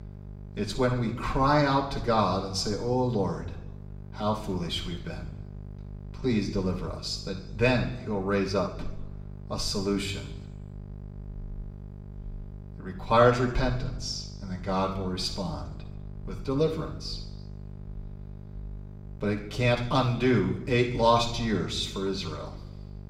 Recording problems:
room echo; slight; dies away in 0.8 s
off-mic speech; somewhat distant
electrical hum; faint; throughout; 50 Hz, 25 dB below the speech

